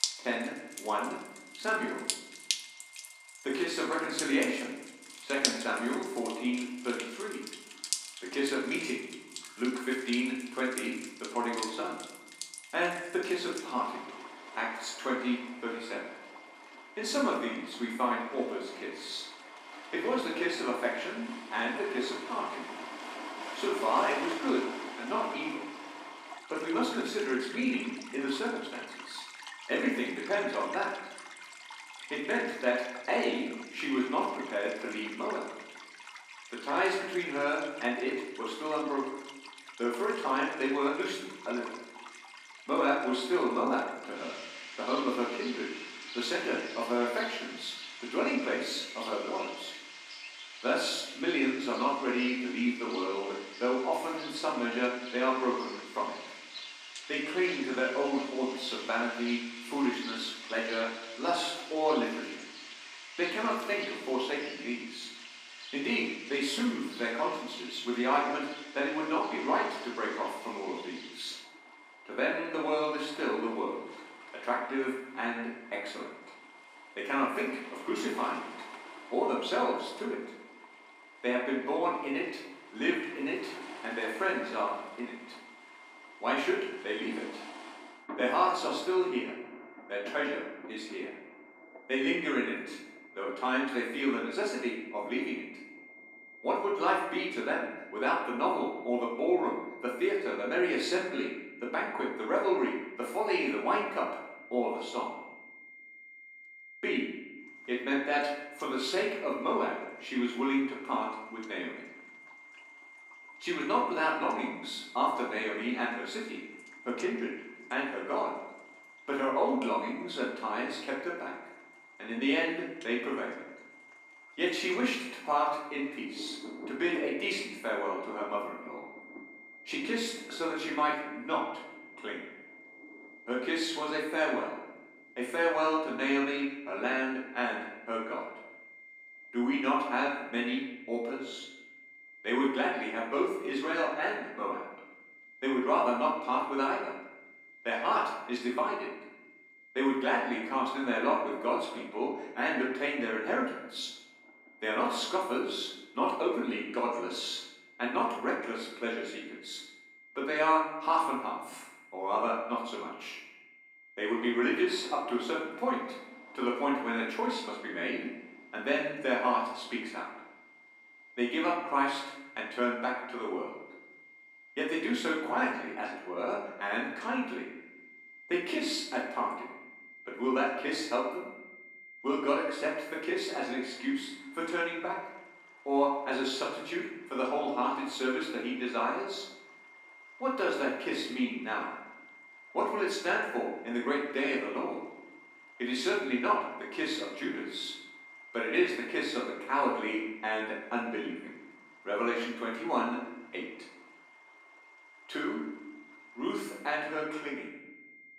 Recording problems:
off-mic speech; far
room echo; noticeable; dies away in 0.9 s
thin; very slightly; fading below 250 Hz
rain or running water; noticeable; throughout; 10 dB below the speech
high-pitched whine; faint; throughout; 2 kHz, 20 dB below the speech

